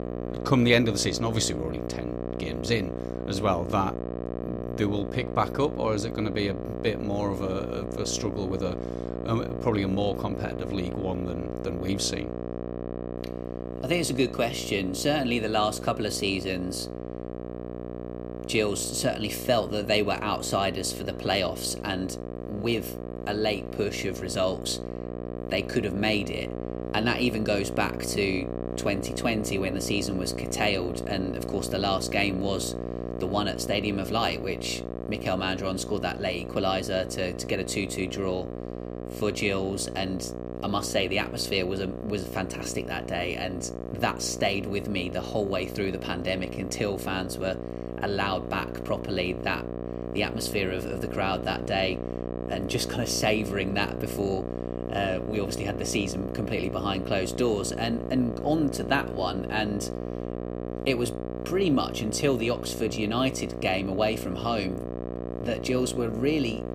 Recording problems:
electrical hum; loud; throughout; 60 Hz, 8 dB below the speech

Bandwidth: 15 kHz